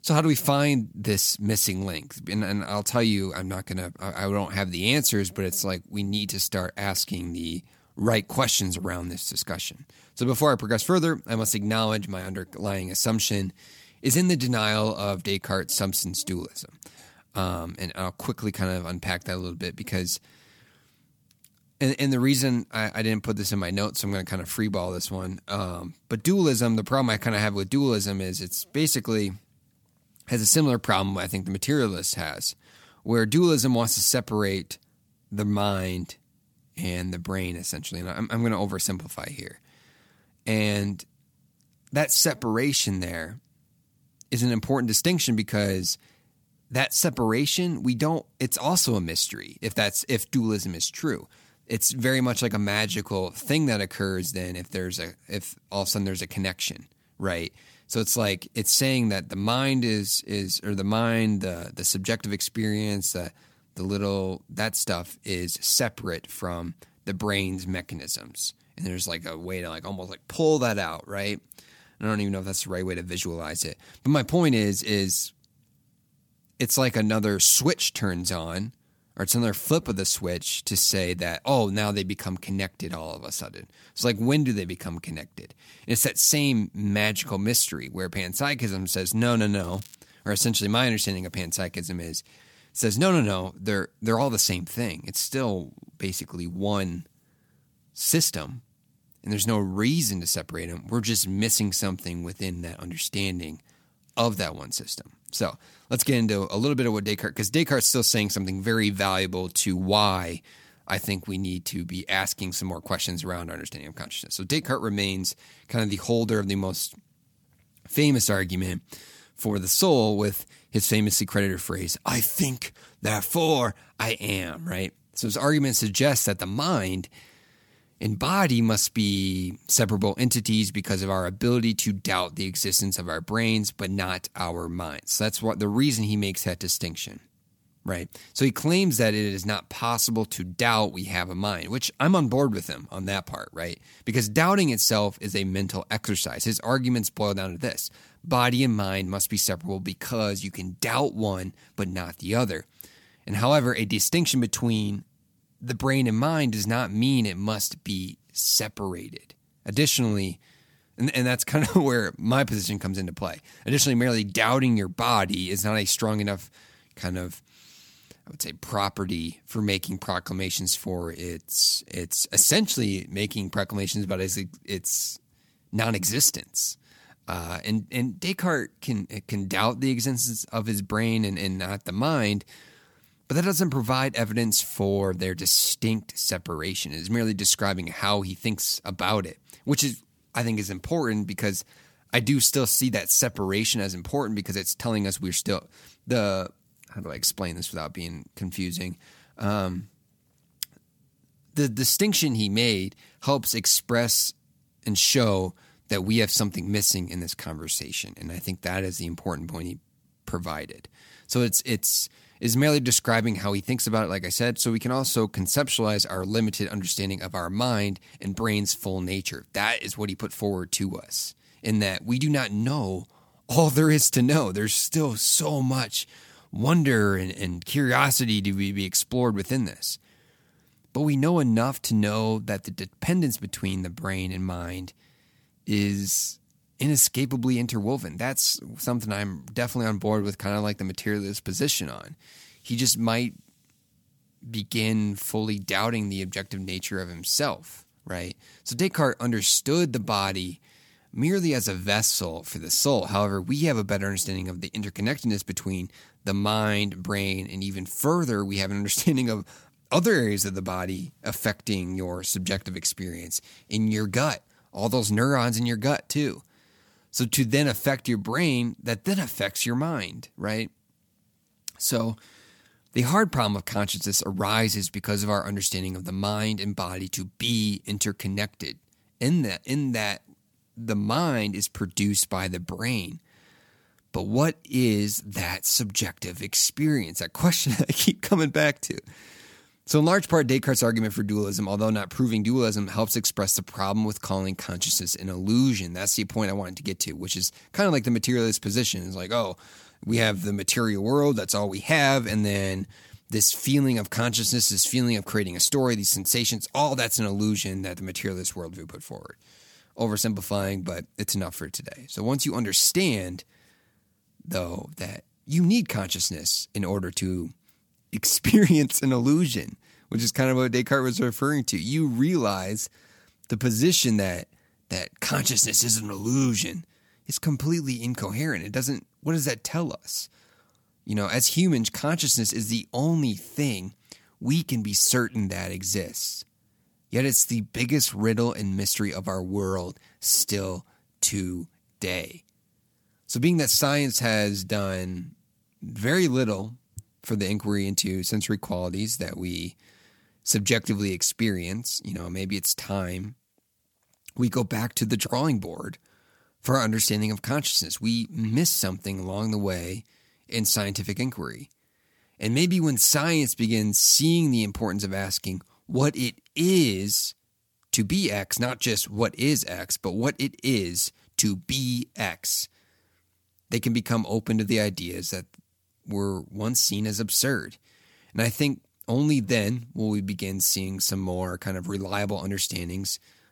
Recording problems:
crackling; faint; at 1:30; 25 dB below the speech

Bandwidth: 18.5 kHz